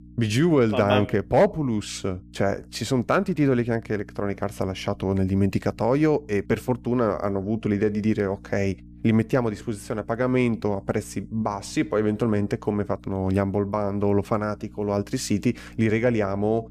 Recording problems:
electrical hum; faint; throughout; 60 Hz, 30 dB below the speech

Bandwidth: 14.5 kHz